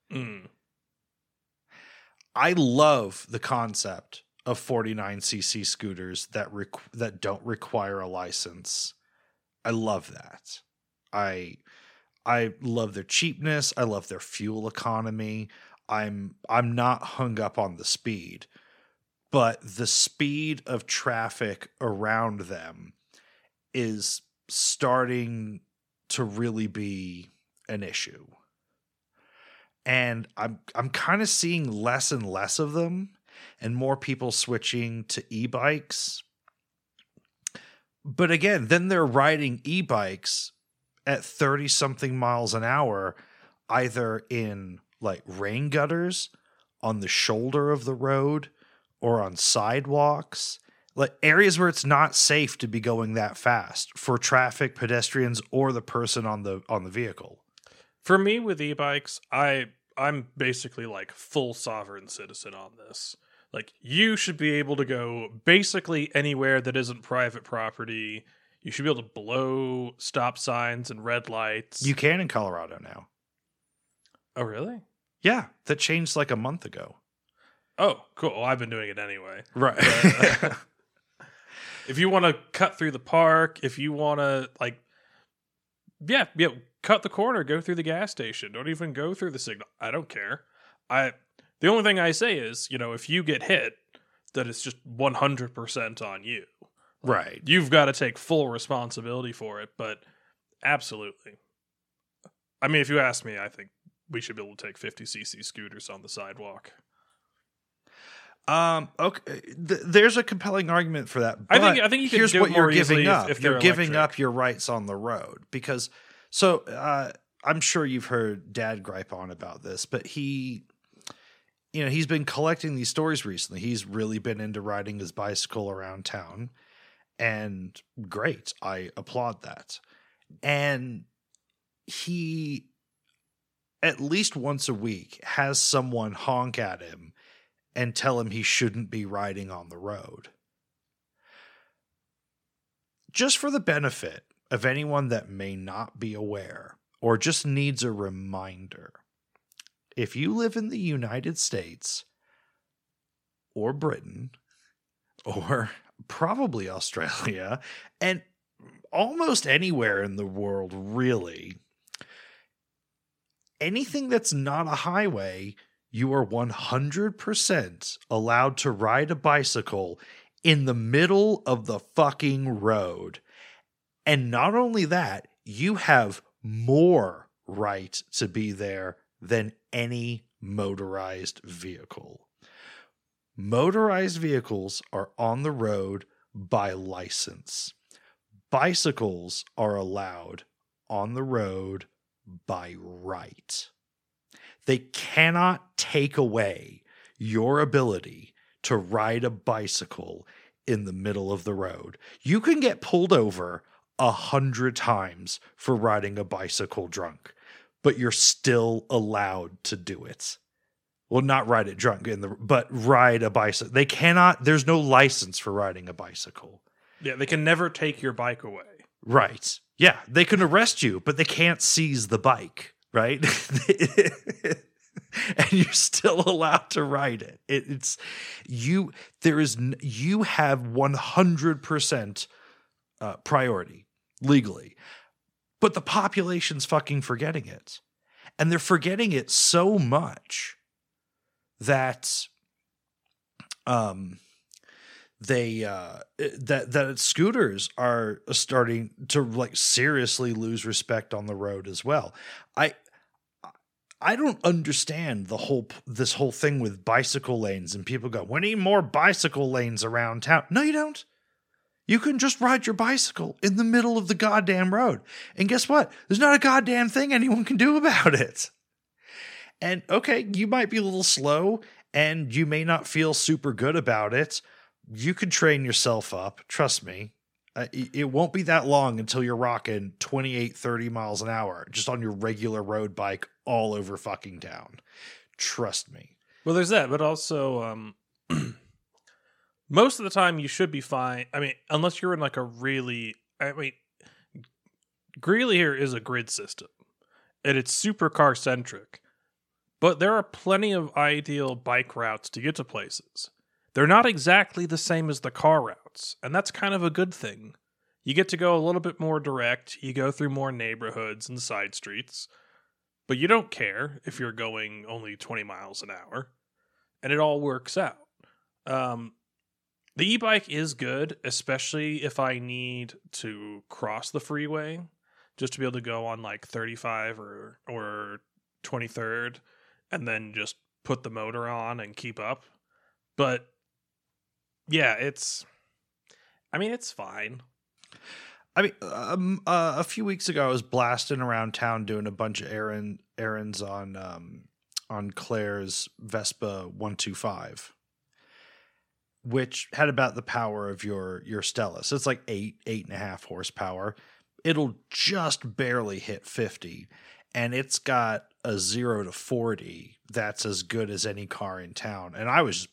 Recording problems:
none

